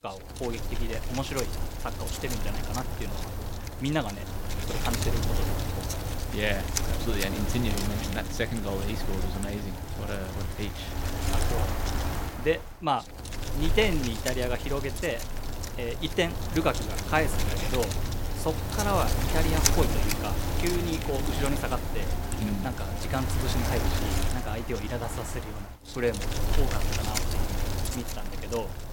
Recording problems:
wind noise on the microphone; heavy; 2 dB below the speech

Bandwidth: 16.5 kHz